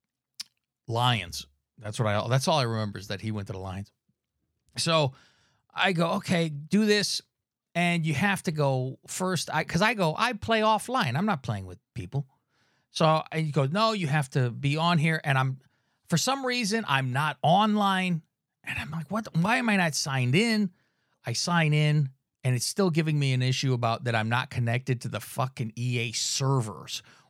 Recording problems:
none

